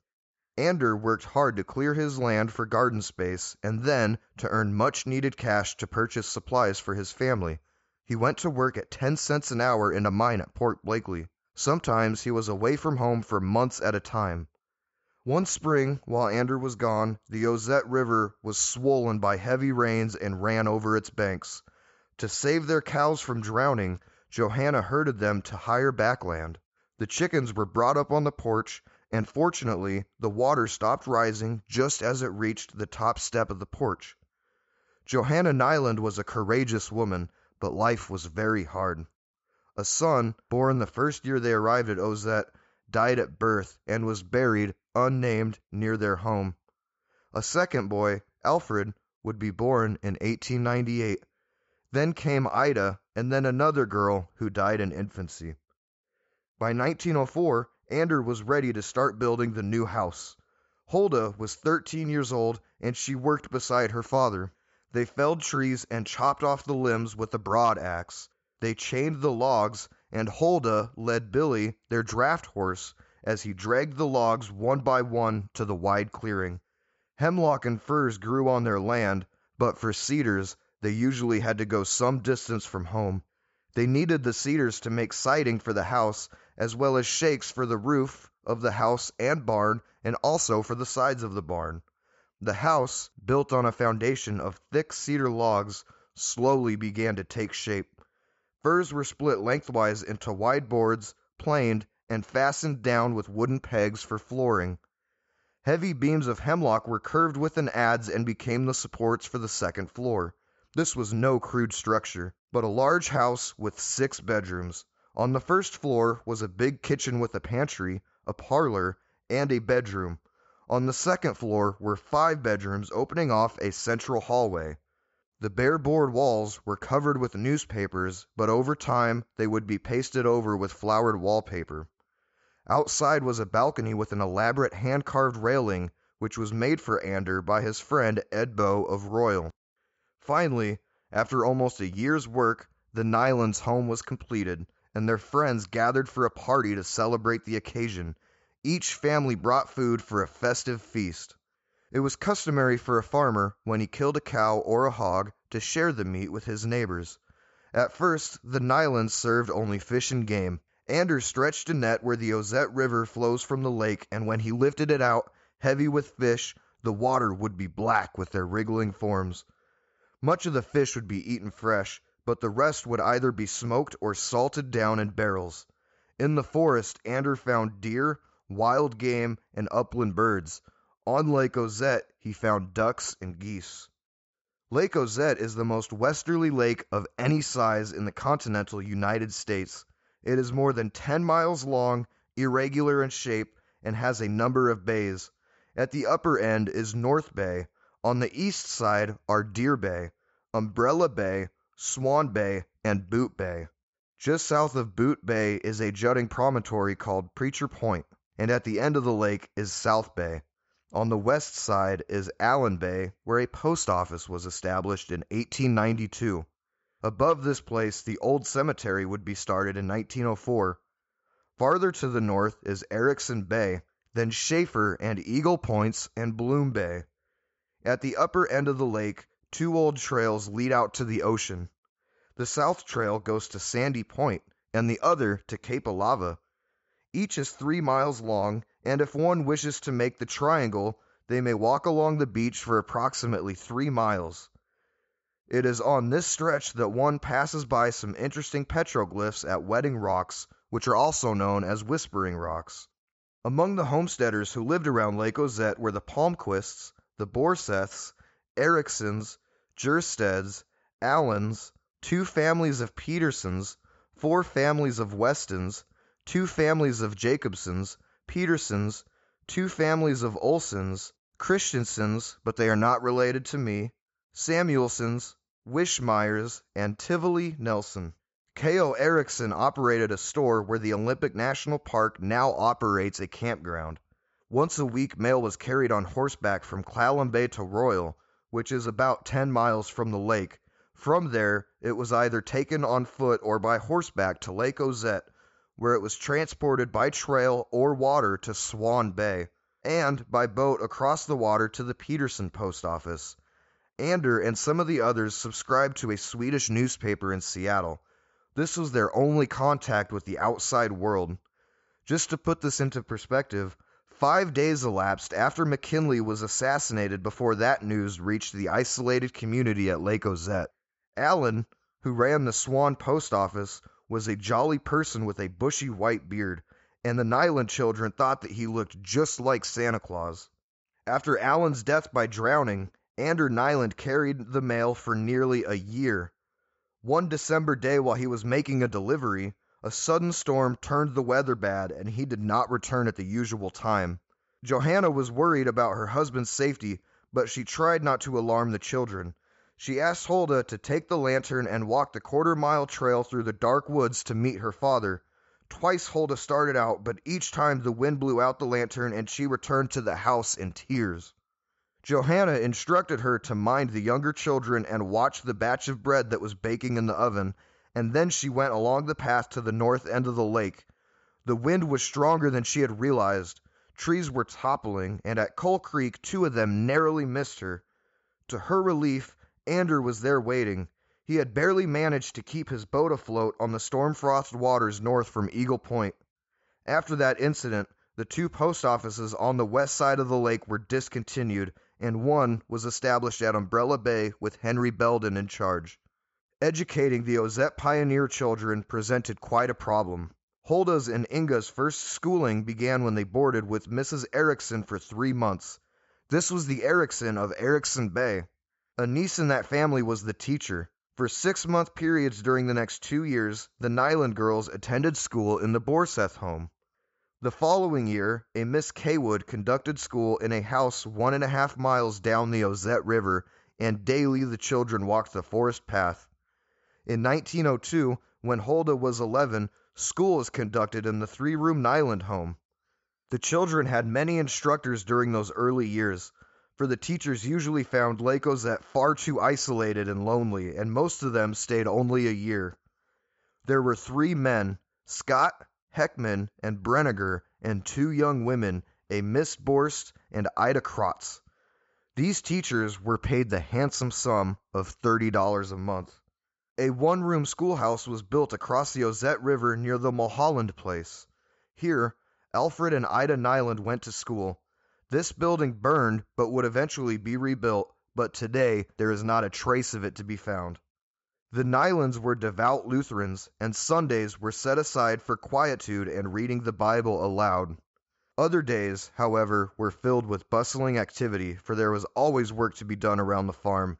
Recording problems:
high frequencies cut off; noticeable; nothing above 8 kHz

